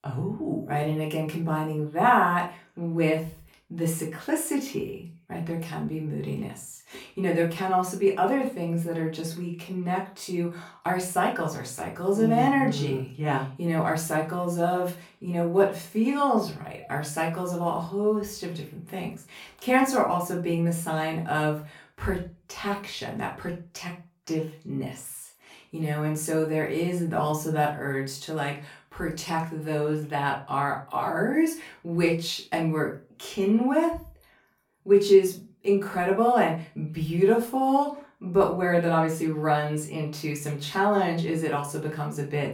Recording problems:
off-mic speech; far
room echo; slight; dies away in 0.3 s

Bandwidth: 17 kHz